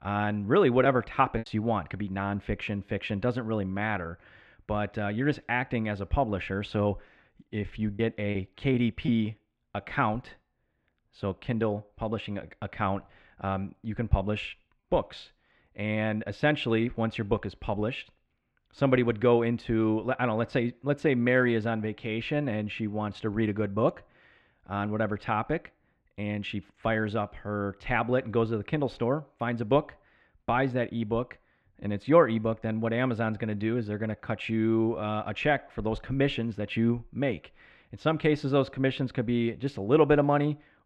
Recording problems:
muffled; slightly; fading above 2.5 kHz
choppy; occasionally; at 1 s and from 8 to 10 s; 4% of the speech affected

